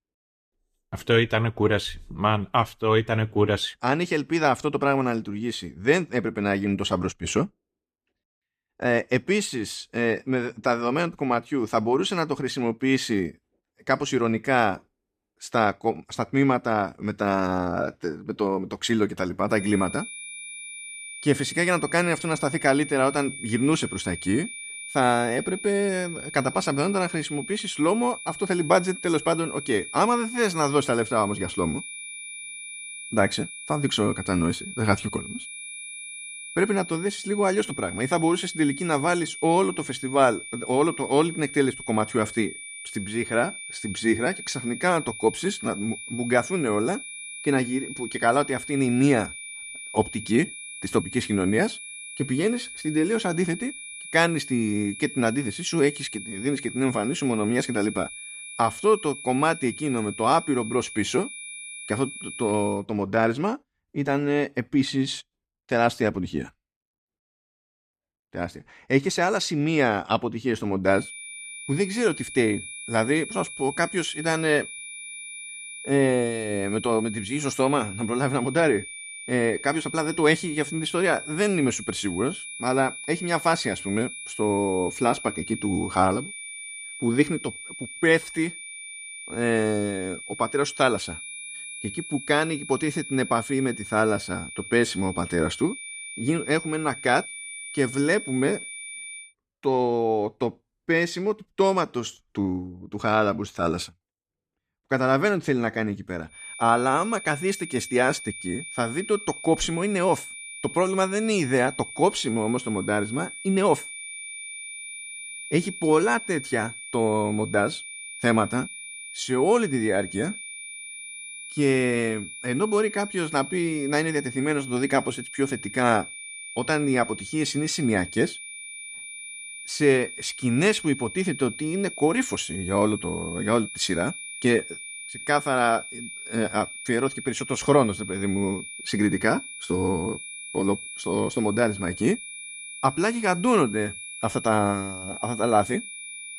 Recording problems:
high-pitched whine; noticeable; from 20 s to 1:03, from 1:11 to 1:39 and from 1:46 on; 2.5 kHz, 10 dB below the speech

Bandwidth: 14.5 kHz